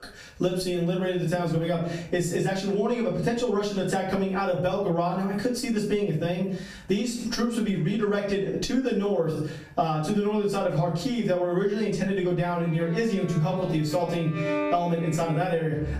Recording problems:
off-mic speech; far
room echo; slight; dies away in 0.4 s
squashed, flat; somewhat
background music; very faint; from 13 s on; 9 dB below the speech

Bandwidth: 14.5 kHz